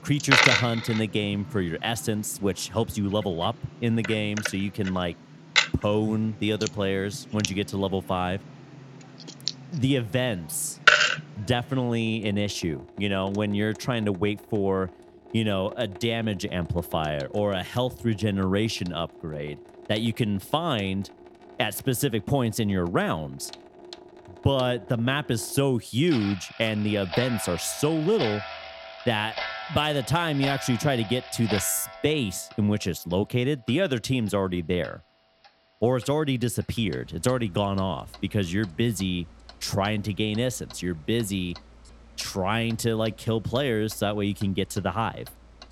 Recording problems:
household noises; loud; throughout; 1 dB below the speech

